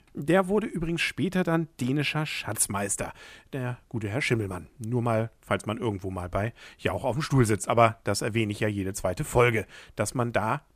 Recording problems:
none

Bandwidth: 14.5 kHz